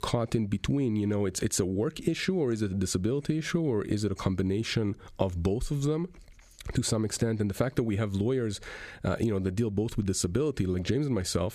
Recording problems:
squashed, flat; somewhat

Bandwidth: 14.5 kHz